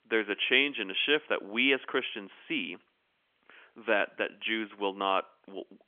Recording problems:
phone-call audio; nothing above 3.5 kHz

